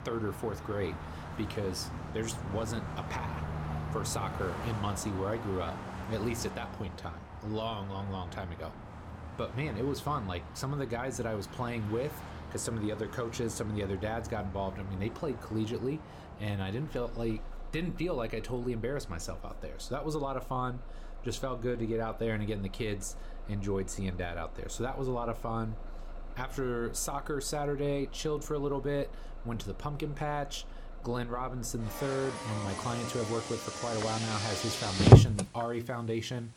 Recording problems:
traffic noise; very loud; throughout; 2 dB above the speech

